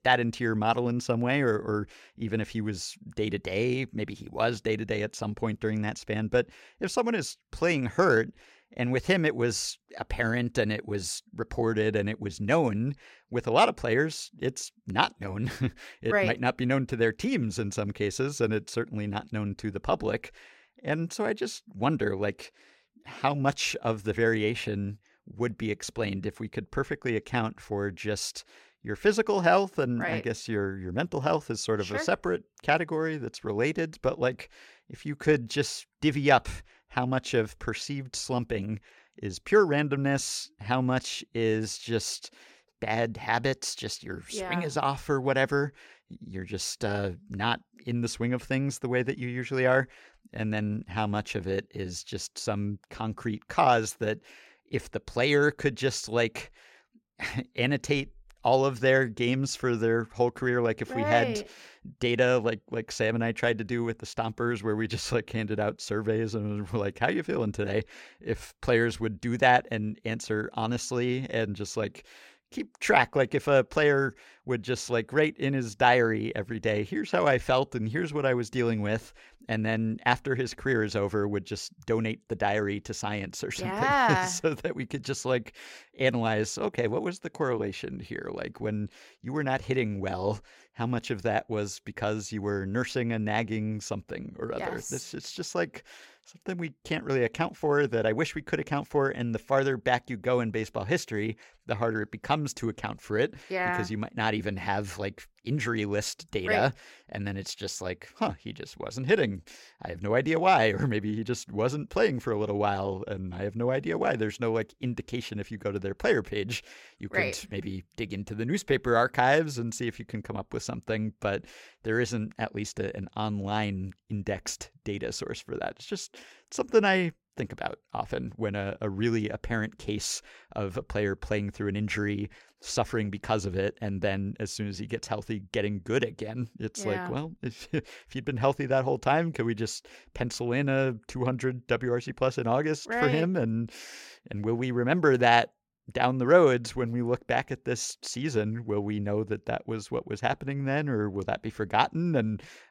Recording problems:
none

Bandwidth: 16 kHz